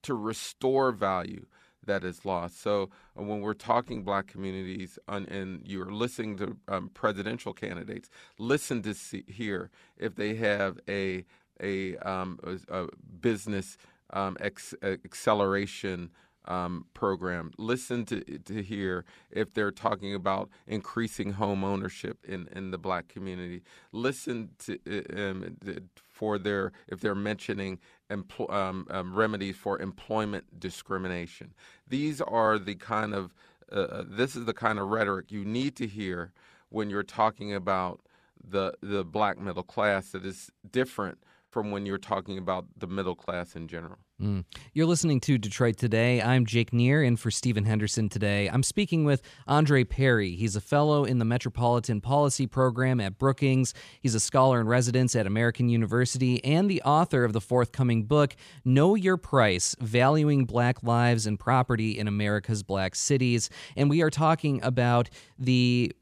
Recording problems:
choppy; occasionally; from 40 to 43 s; 2% of the speech affected

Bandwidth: 14.5 kHz